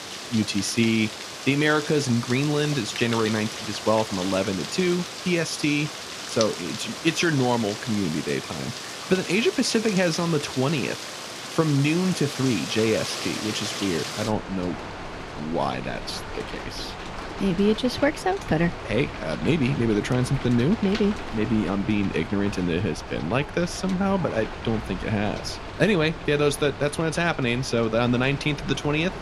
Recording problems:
rain or running water; loud; throughout; 9 dB below the speech

